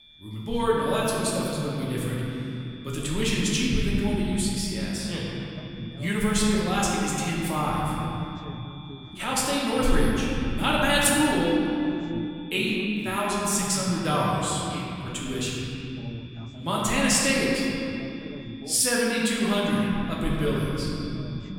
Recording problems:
room echo; strong; dies away in 3 s
off-mic speech; far
voice in the background; noticeable; throughout; 20 dB below the speech
high-pitched whine; faint; throughout; 3.5 kHz, 20 dB below the speech

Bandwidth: 18.5 kHz